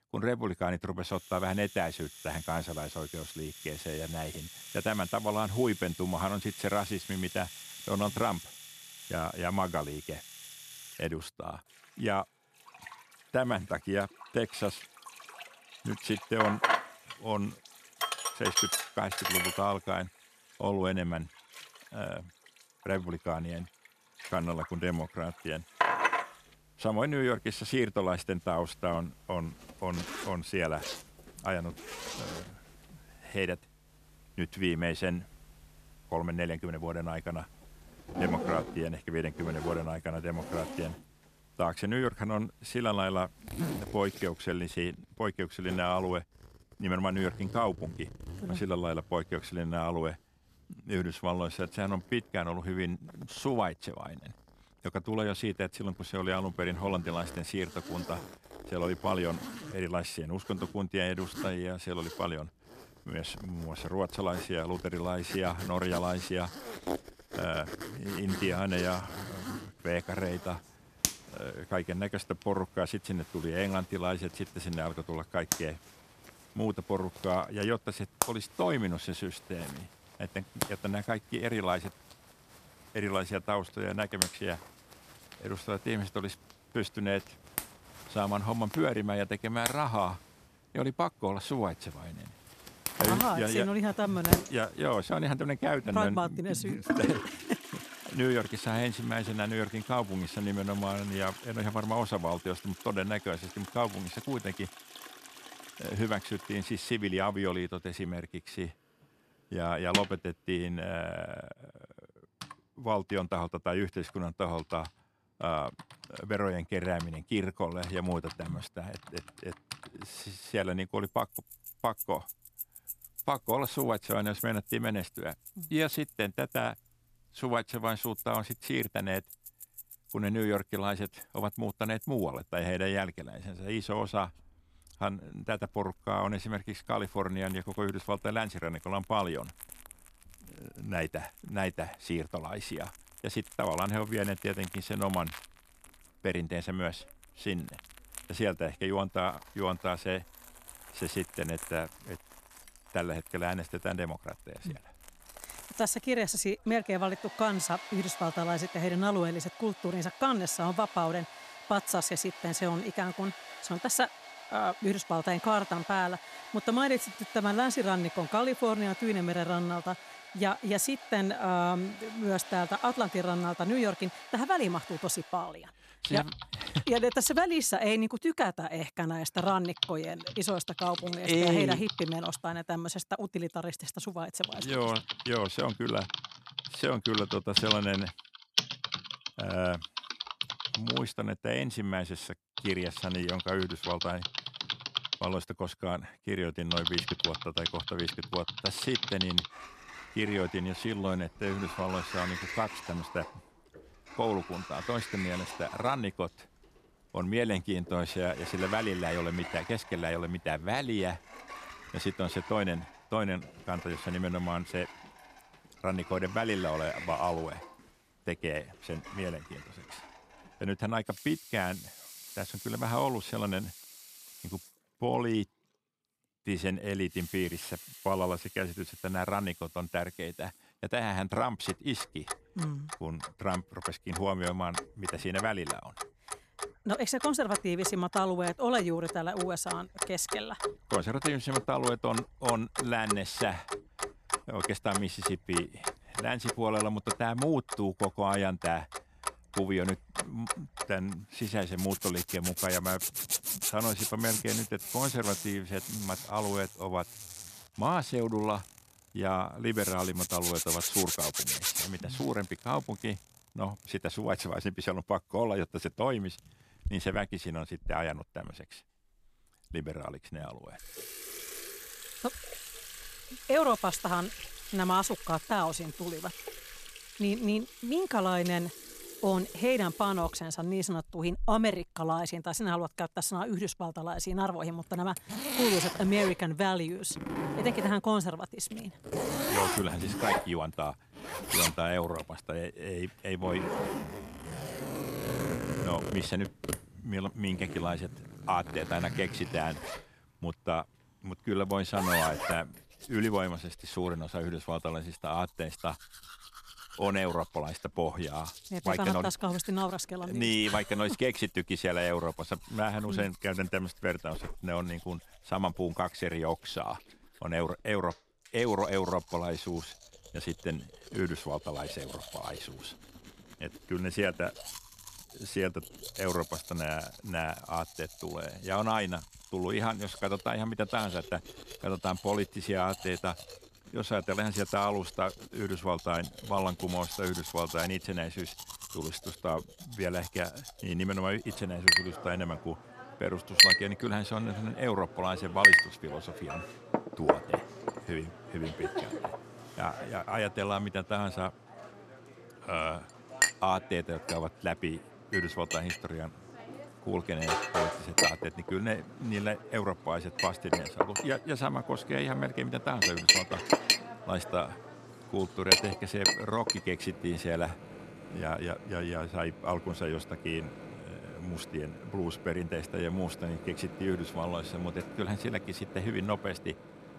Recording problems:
household noises; loud; throughout; 2 dB below the speech

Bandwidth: 14.5 kHz